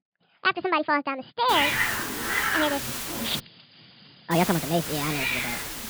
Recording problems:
wrong speed and pitch; too fast and too high; 1.5 times normal speed
high frequencies cut off; noticeable; nothing above 5 kHz
hiss; loud; from 1.5 to 3.5 s and from 4.5 s on; as loud as the speech

